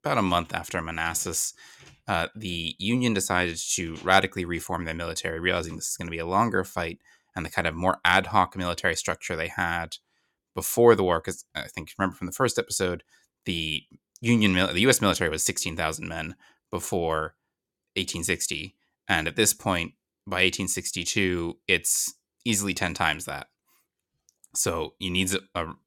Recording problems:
none

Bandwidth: 17.5 kHz